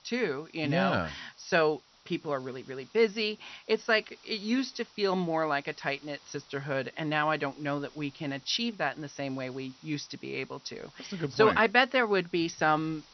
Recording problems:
high frequencies cut off; noticeable; nothing above 6 kHz
hiss; faint; throughout; 25 dB below the speech

